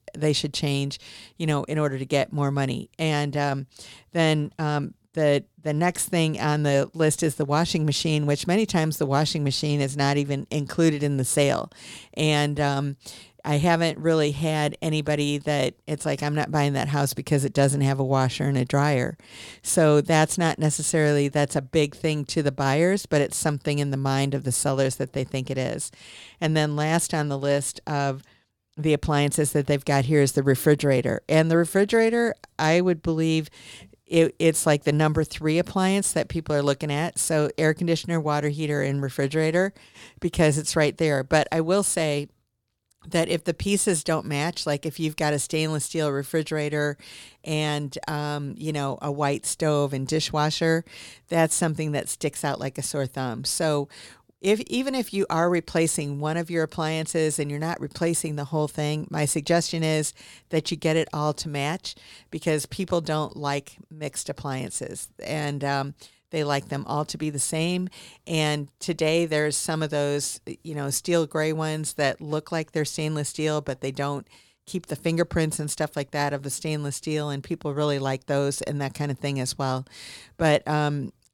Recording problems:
none

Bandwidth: 18 kHz